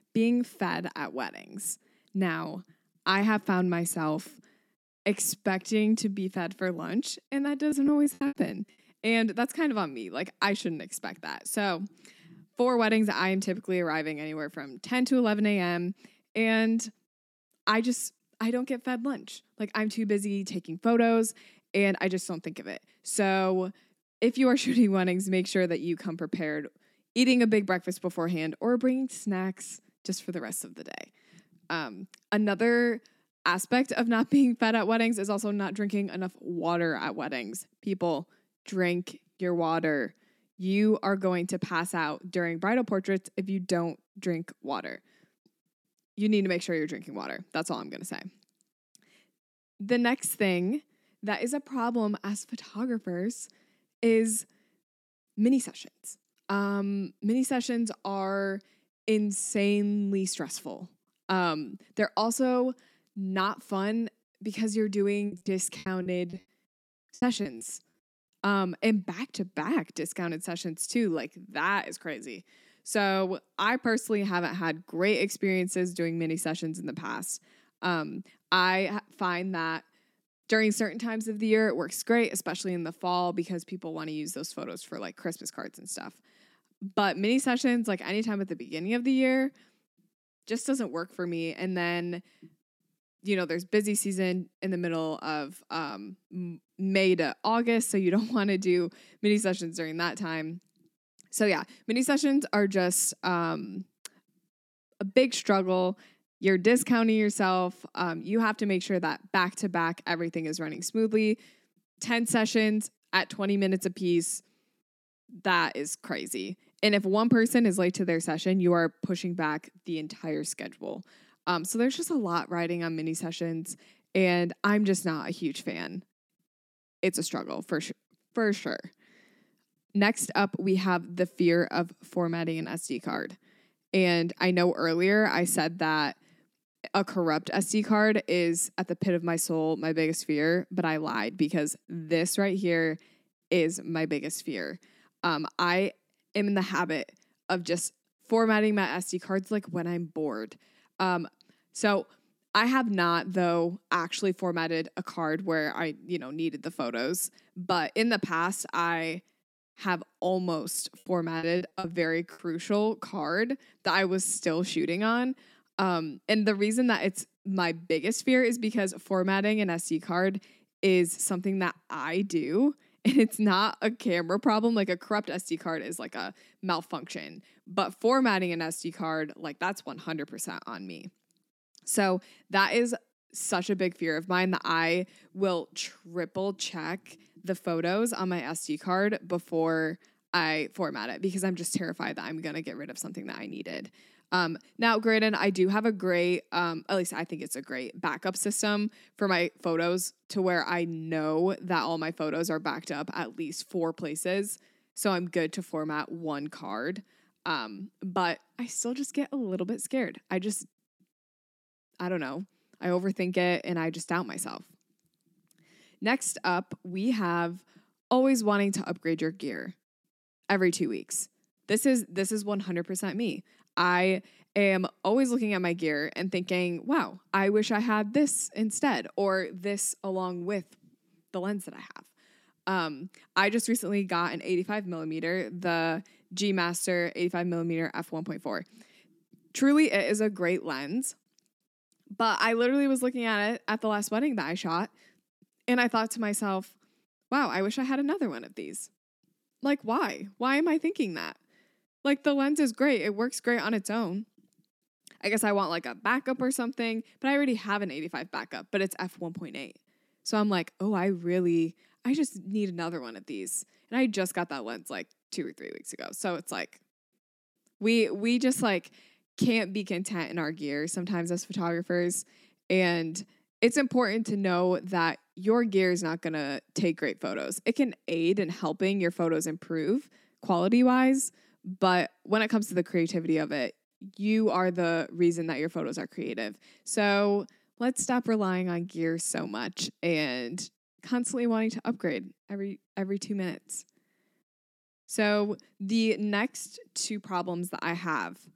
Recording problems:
choppy; very; at 7.5 s, from 1:05 to 1:08 and from 2:41 to 2:42; 16% of the speech affected

